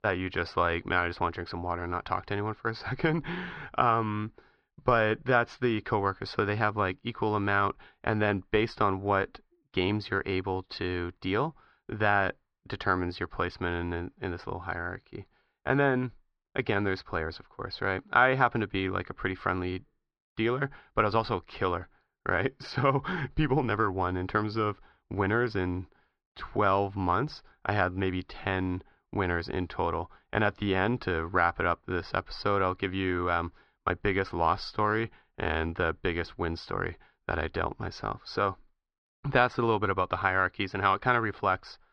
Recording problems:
muffled; slightly; fading above 4.5 kHz

